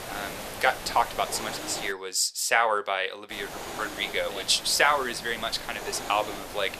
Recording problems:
thin; very; fading below 600 Hz
hiss; noticeable; until 2 s and from 3.5 s on; 10 dB below the speech

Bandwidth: 14.5 kHz